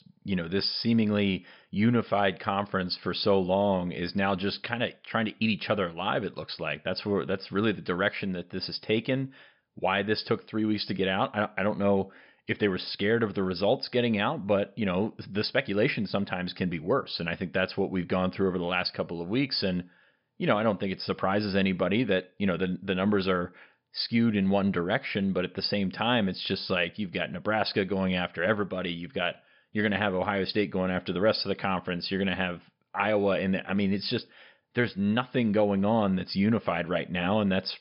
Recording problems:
high frequencies cut off; noticeable; nothing above 5.5 kHz

